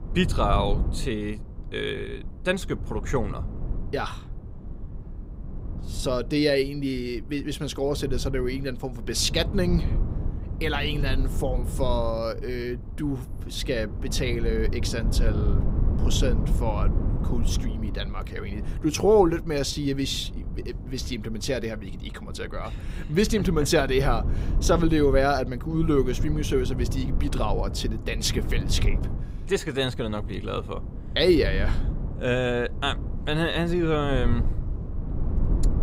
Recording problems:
low rumble; noticeable; throughout; 15 dB below the speech

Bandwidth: 15.5 kHz